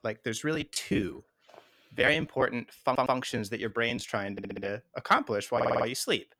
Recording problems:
choppy; very; from 0.5 to 2.5 s and from 3.5 to 6 s; 11% of the speech affected
audio stuttering; at 3 s, at 4.5 s and at 5.5 s

